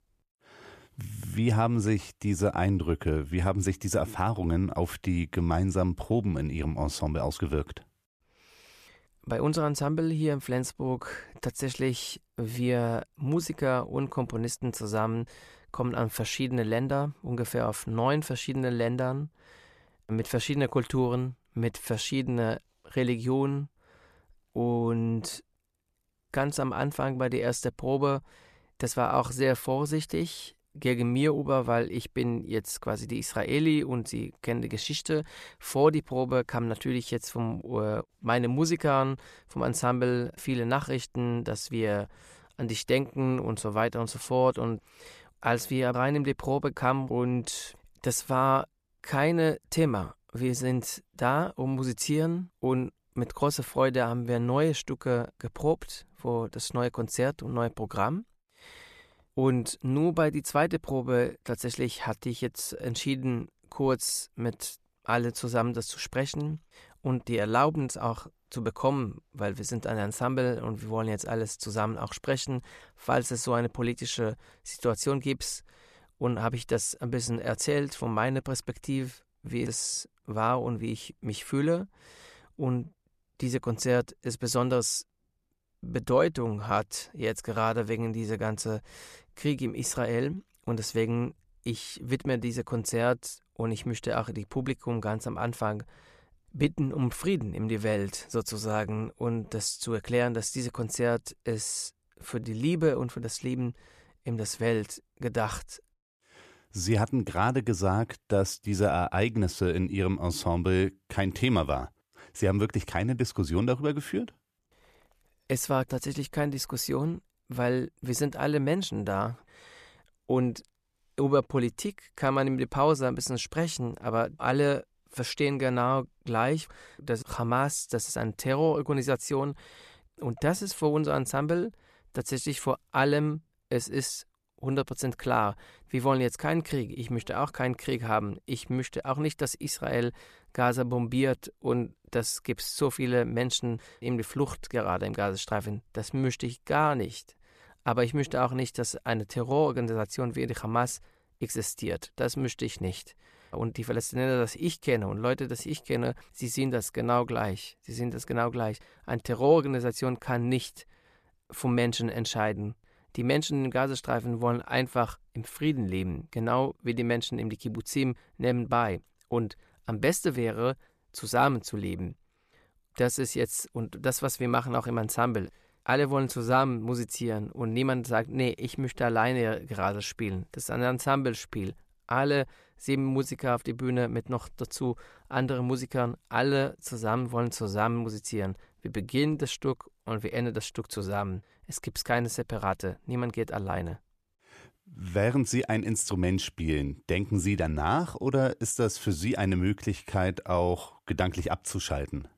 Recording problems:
none

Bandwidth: 14.5 kHz